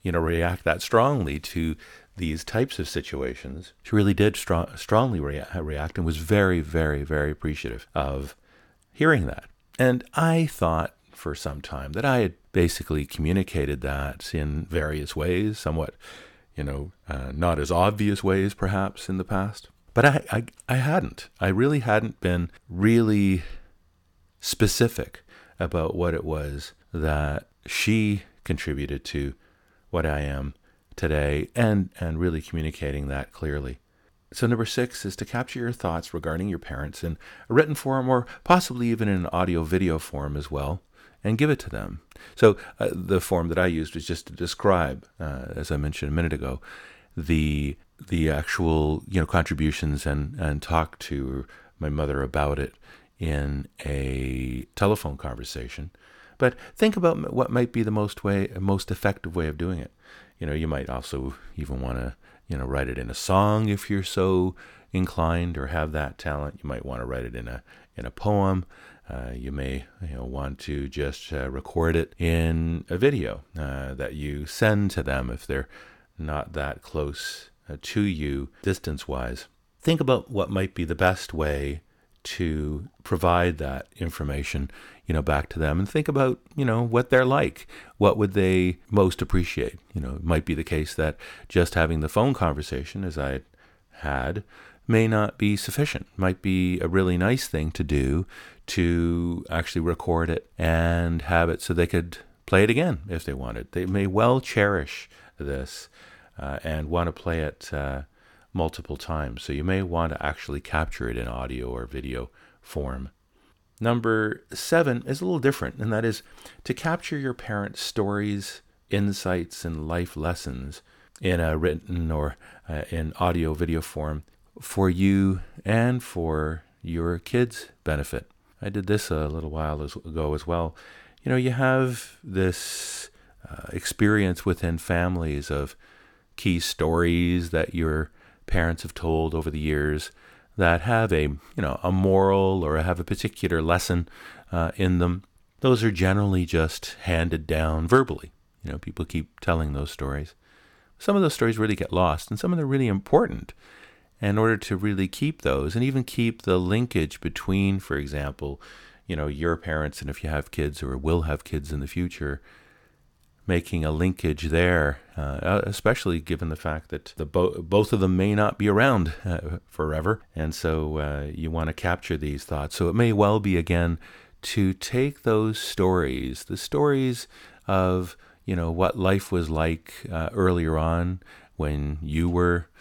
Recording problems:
none

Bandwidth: 17.5 kHz